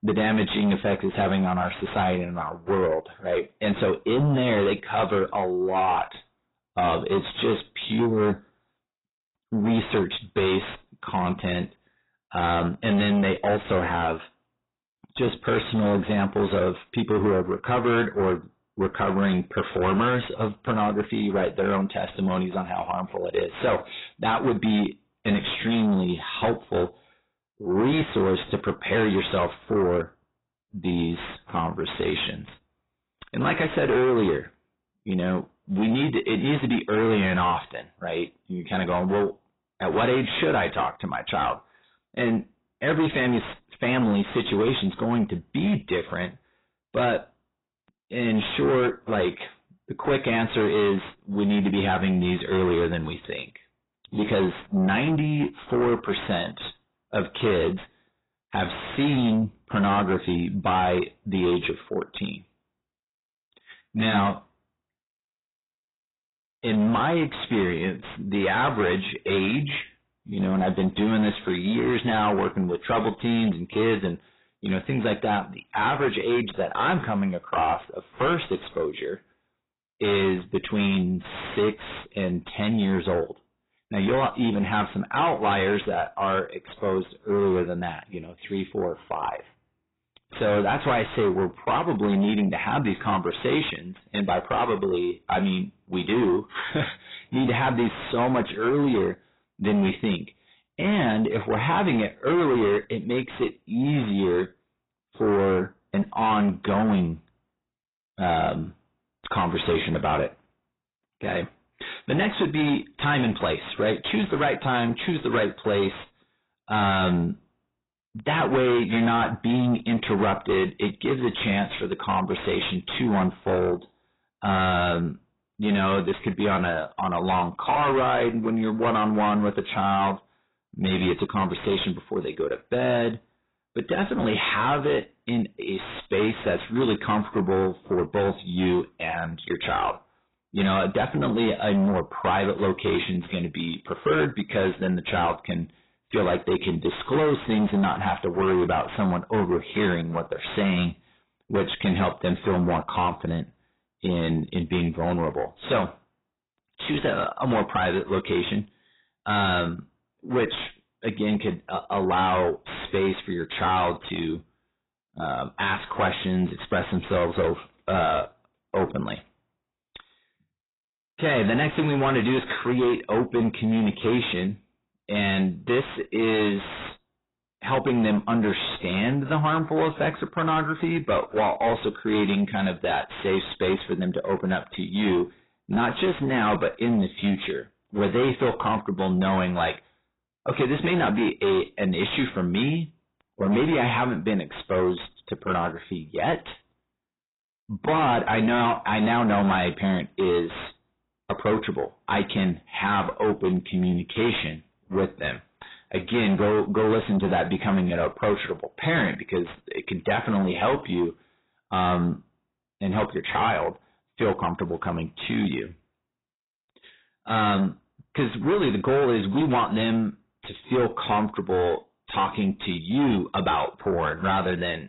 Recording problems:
distortion; heavy; 7 dB below the speech
garbled, watery; badly; nothing above 4 kHz

